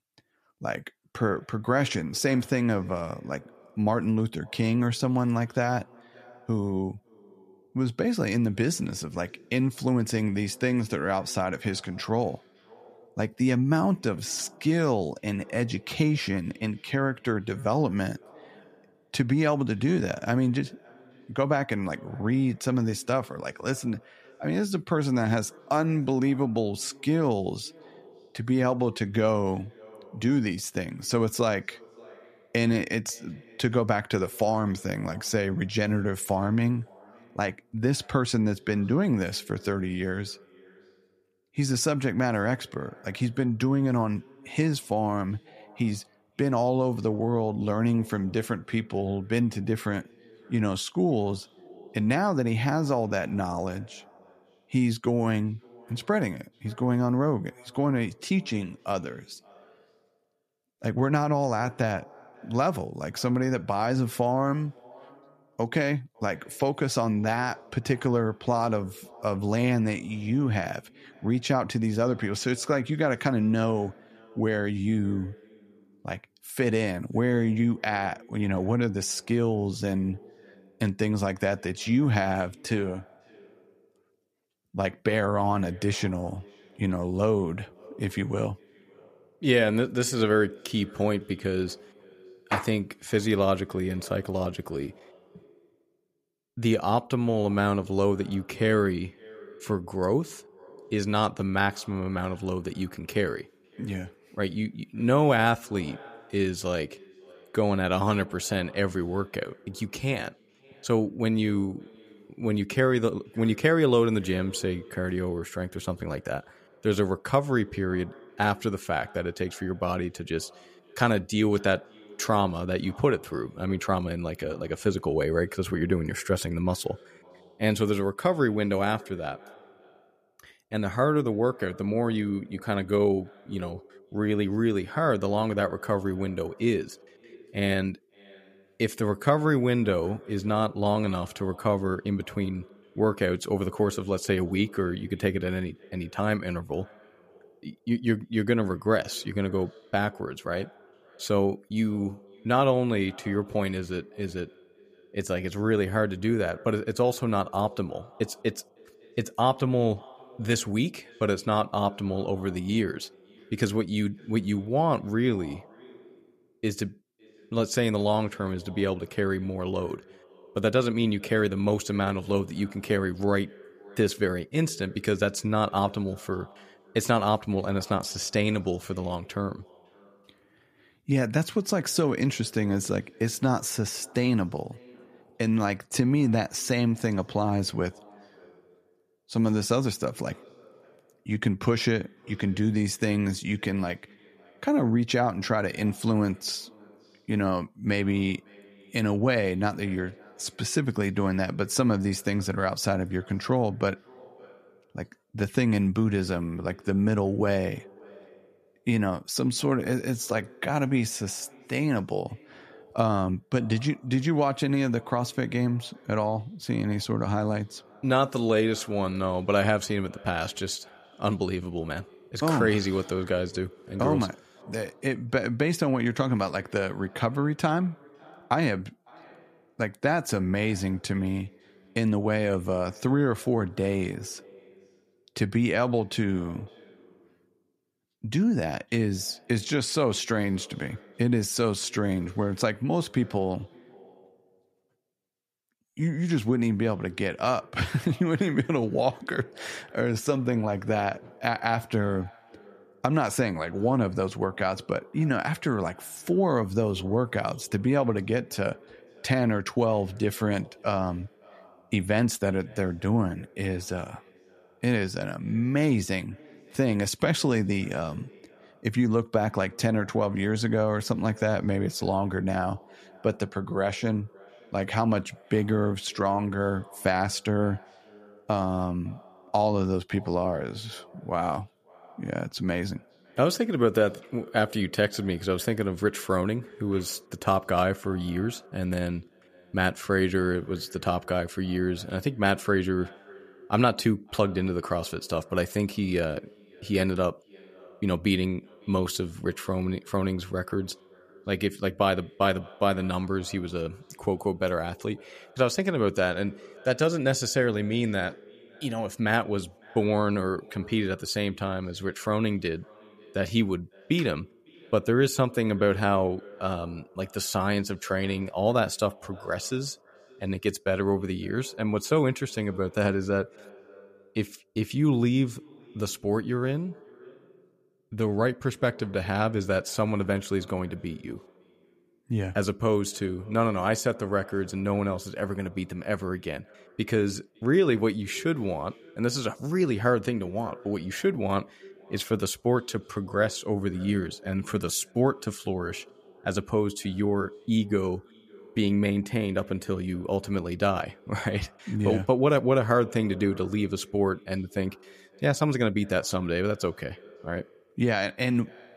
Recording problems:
echo of what is said; faint; throughout; 550 ms later, 25 dB below the speech

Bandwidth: 14.5 kHz